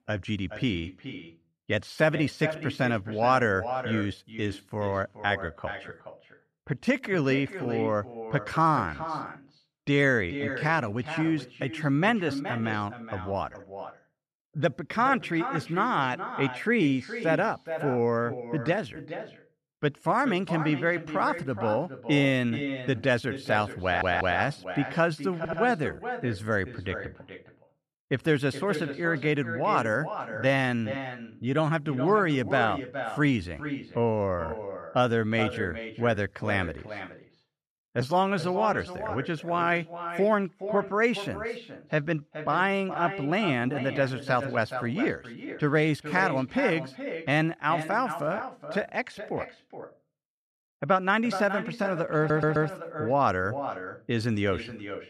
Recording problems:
echo of what is said; strong; throughout; 420 ms later, 10 dB below the speech
audio stuttering; at 24 s, at 25 s and at 52 s

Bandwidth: 14.5 kHz